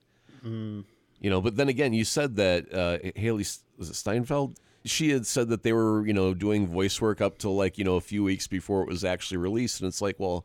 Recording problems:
none

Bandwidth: 17.5 kHz